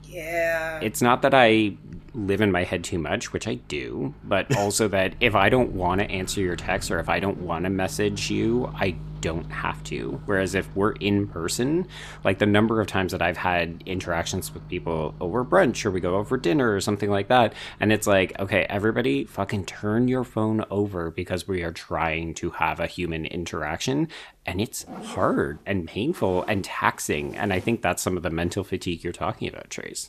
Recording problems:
household noises; noticeable; throughout; 20 dB below the speech

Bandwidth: 14.5 kHz